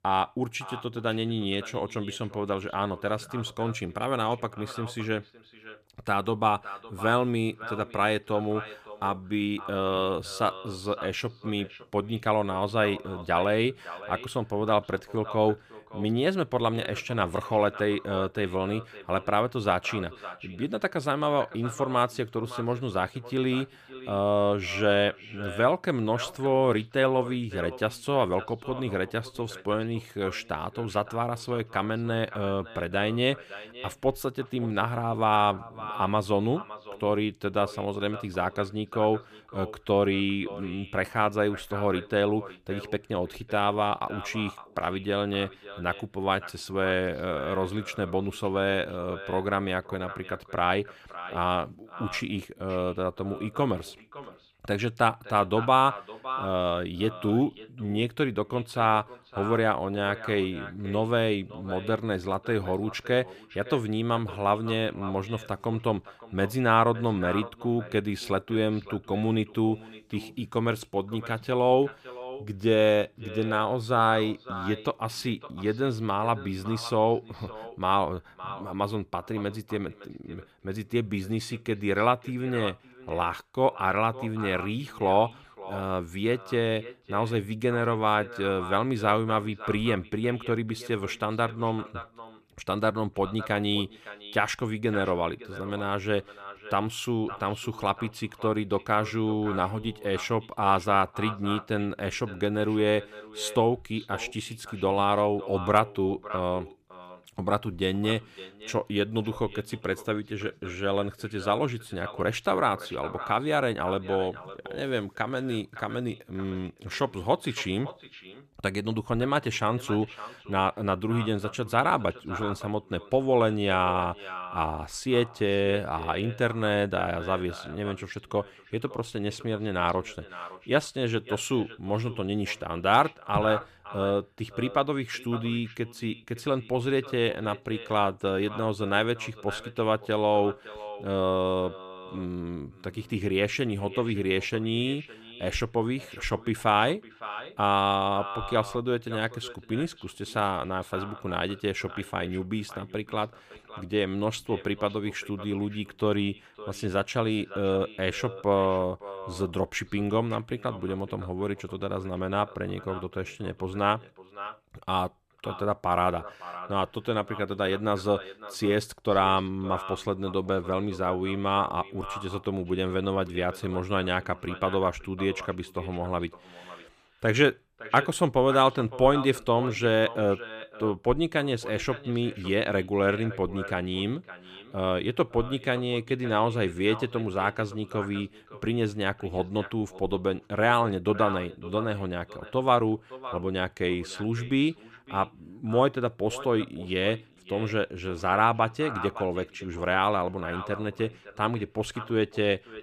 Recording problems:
echo of what is said; noticeable; throughout; 560 ms later, 15 dB below the speech

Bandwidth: 15 kHz